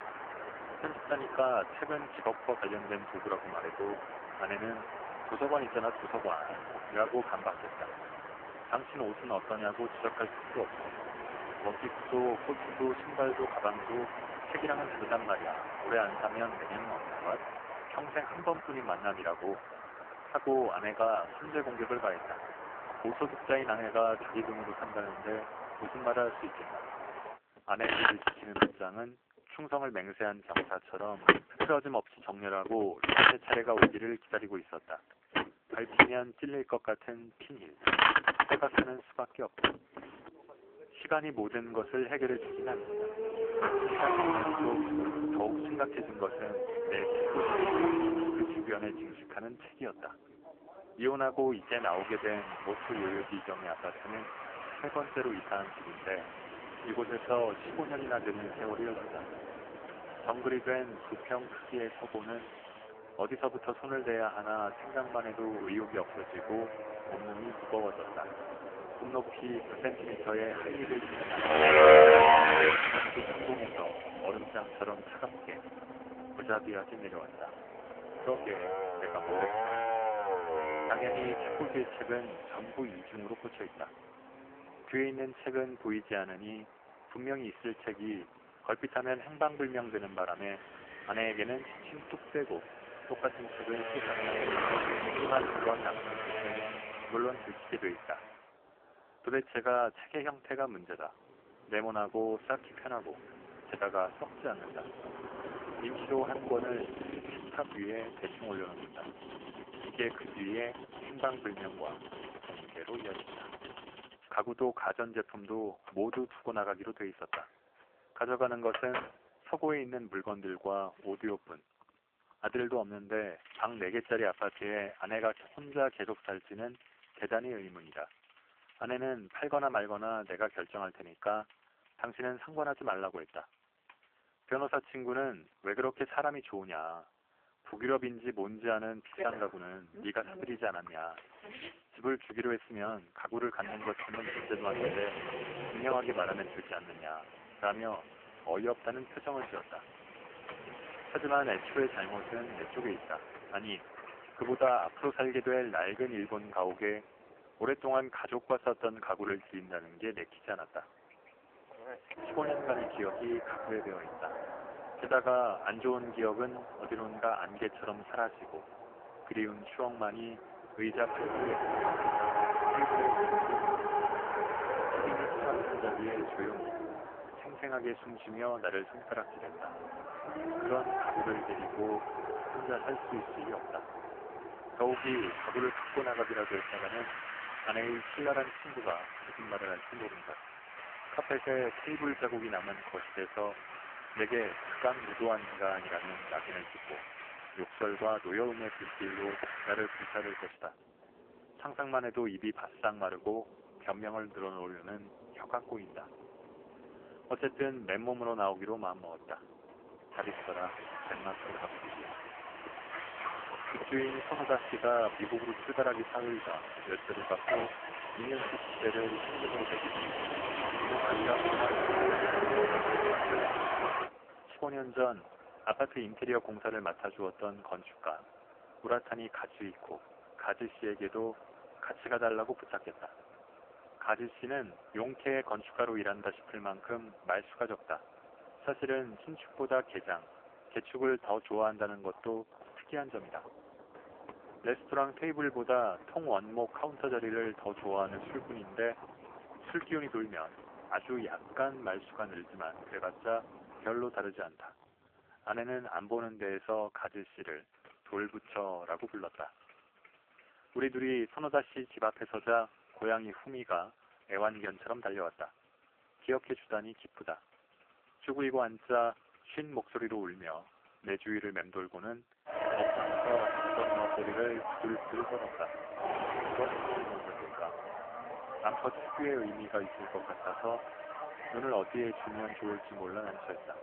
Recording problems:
phone-call audio; poor line
traffic noise; very loud; throughout; 2 dB above the speech

